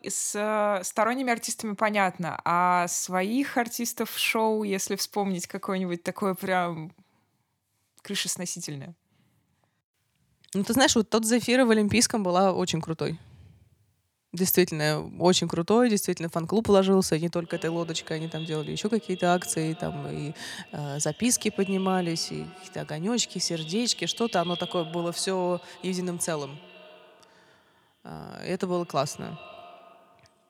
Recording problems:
echo of what is said; noticeable; from 17 s on; 120 ms later, 15 dB below the speech

